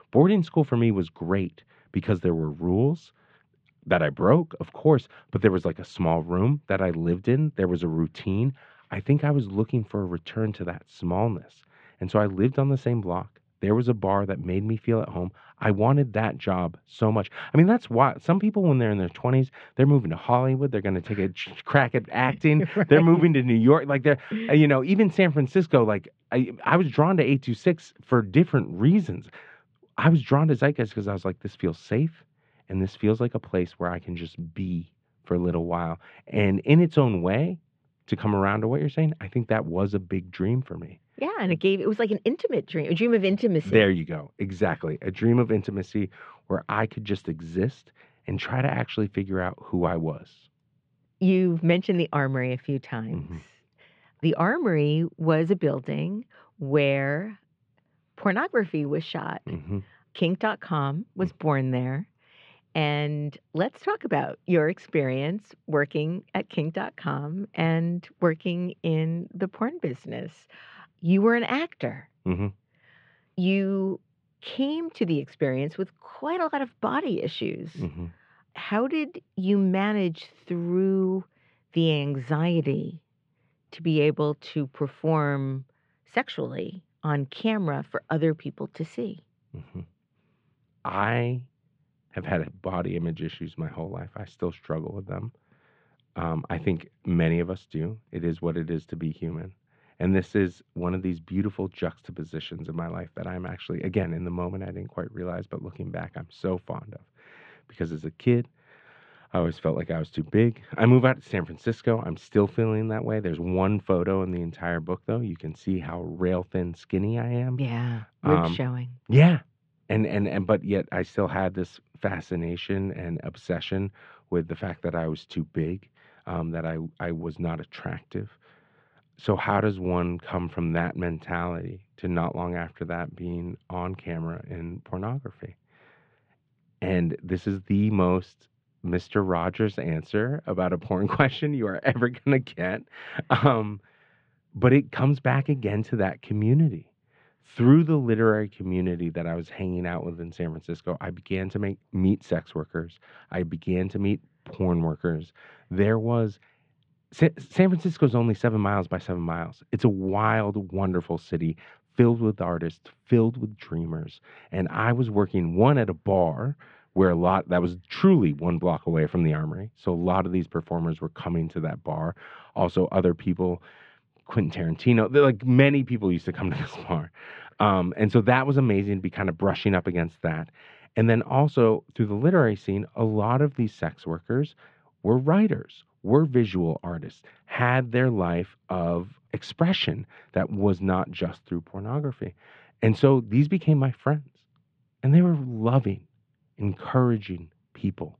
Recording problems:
muffled; very; fading above 3.5 kHz

